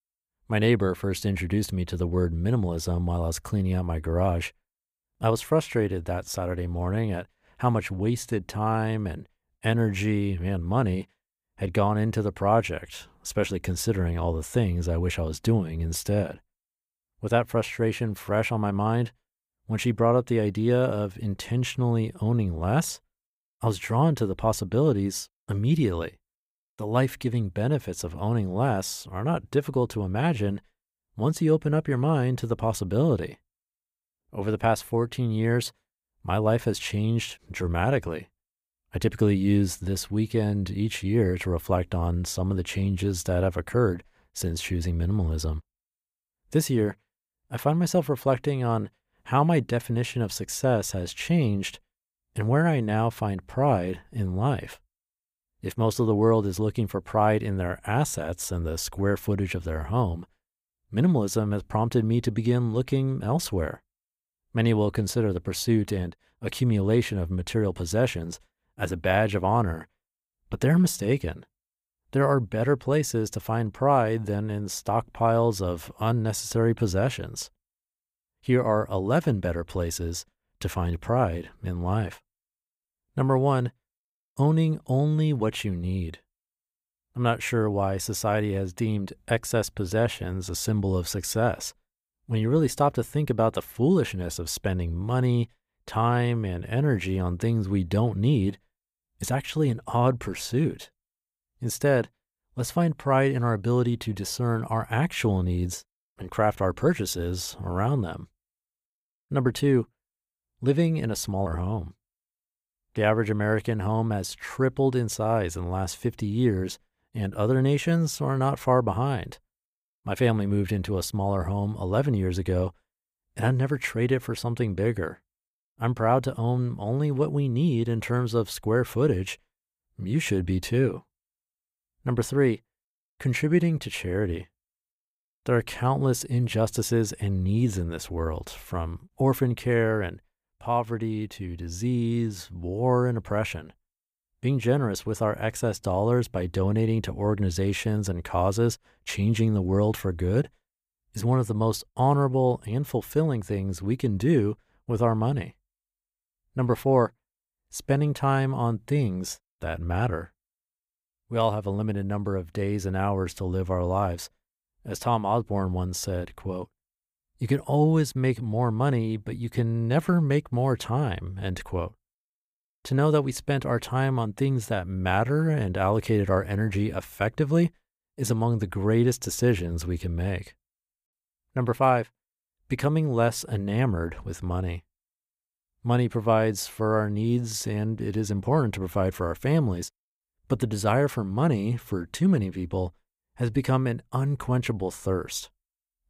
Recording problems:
none

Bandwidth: 15 kHz